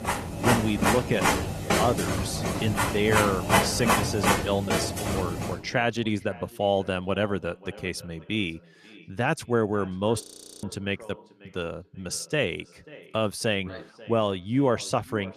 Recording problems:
echo of what is said; faint; throughout; 540 ms later, 20 dB below the speech
garbled, watery; slightly; nothing above 14.5 kHz
household noises; very loud; until 5.5 s; 2 dB above the speech
audio freezing; at 10 s

